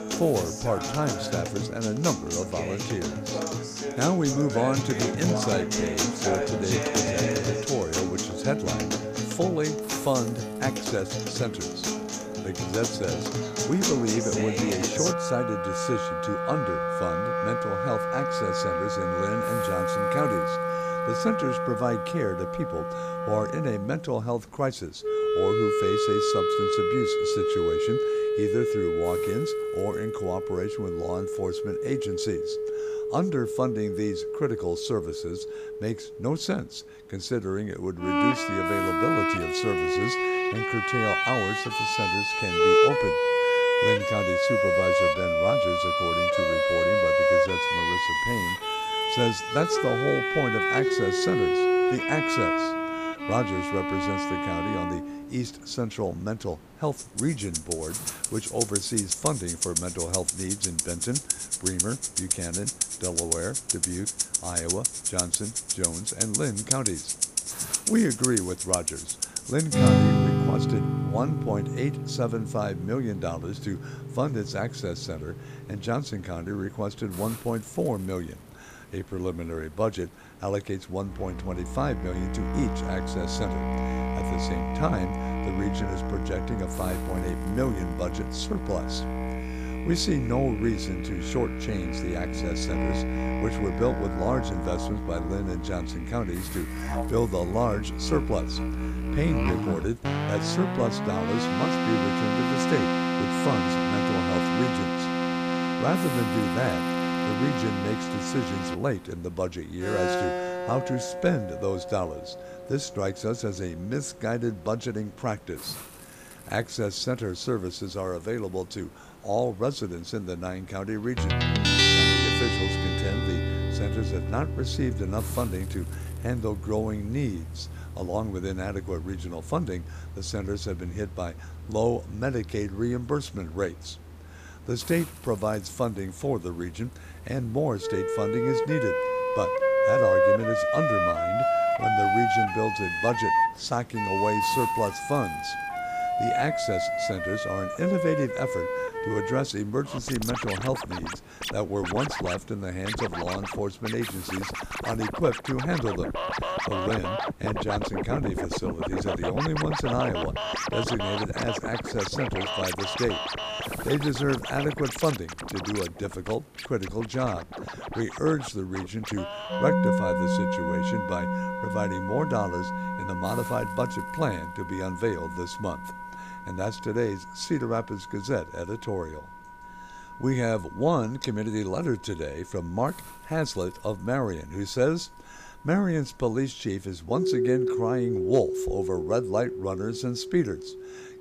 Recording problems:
background music; very loud; throughout; 3 dB above the speech
hiss; noticeable; throughout; 20 dB below the speech

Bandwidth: 15 kHz